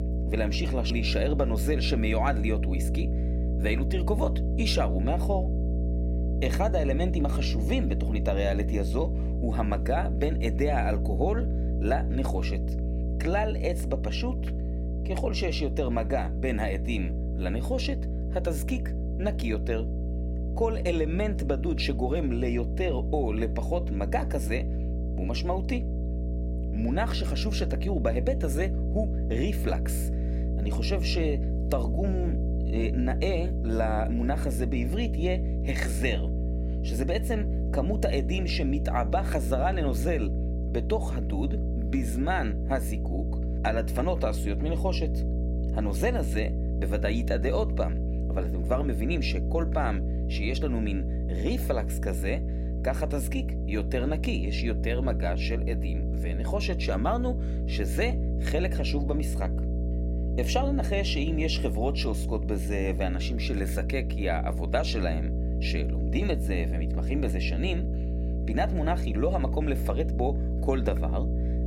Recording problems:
electrical hum; loud; throughout; 60 Hz, 9 dB below the speech

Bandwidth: 16 kHz